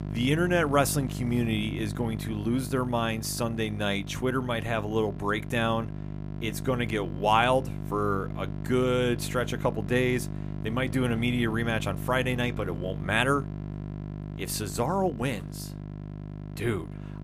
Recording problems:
electrical hum; noticeable; throughout; 50 Hz, 15 dB below the speech

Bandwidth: 15 kHz